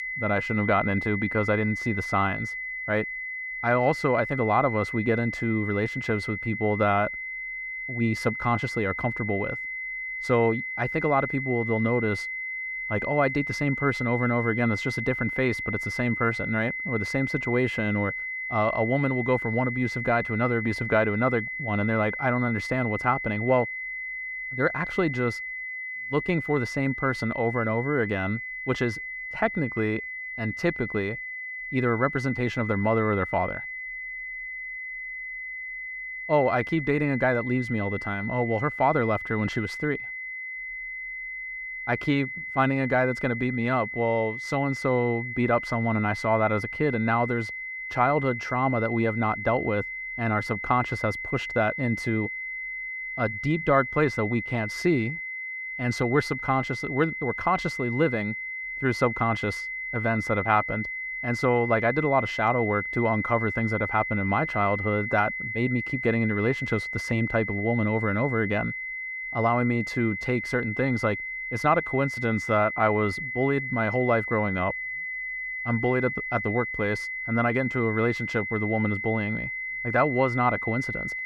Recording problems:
muffled; slightly; fading above 3.5 kHz
high-pitched whine; loud; throughout; 2 kHz, 5 dB below the speech

